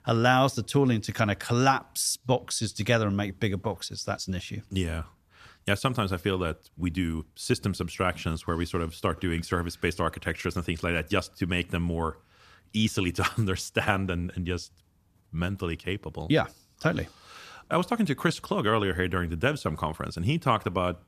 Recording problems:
none

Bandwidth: 14.5 kHz